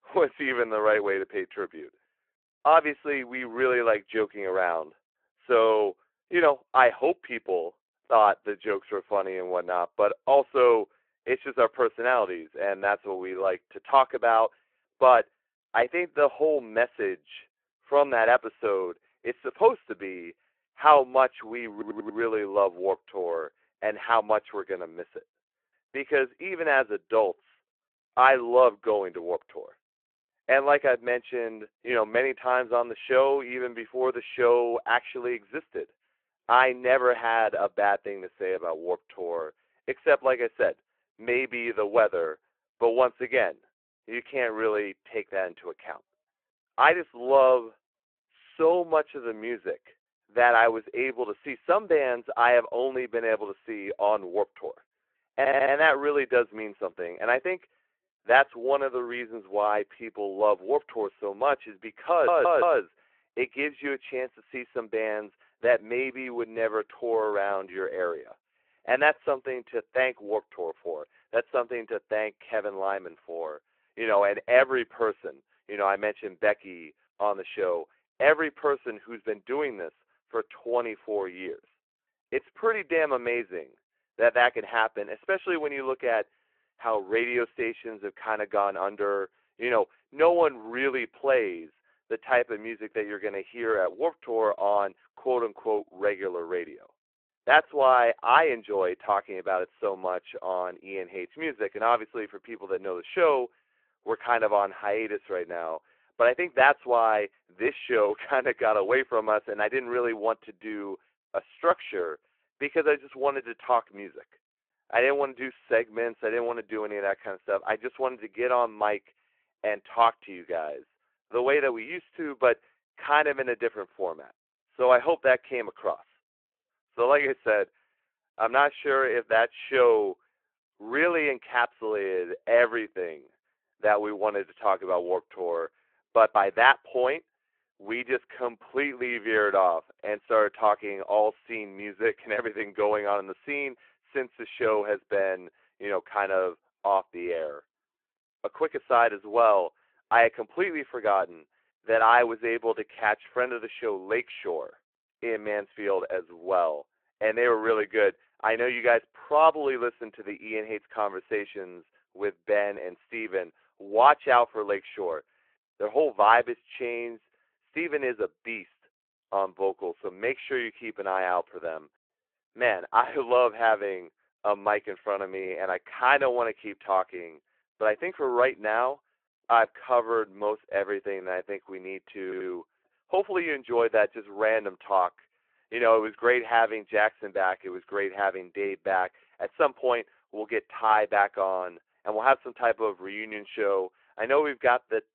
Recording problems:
phone-call audio
audio stuttering; 4 times, first at 22 s

